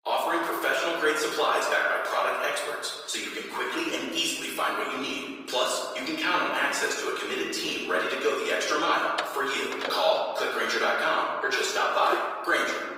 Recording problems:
off-mic speech; far
thin; very; fading below 400 Hz
room echo; noticeable; dies away in 1.6 s
garbled, watery; slightly; nothing above 15.5 kHz
door banging; noticeable; at 9 s; peak 8 dB below the speech
footsteps; noticeable; at 12 s; peak 7 dB below the speech

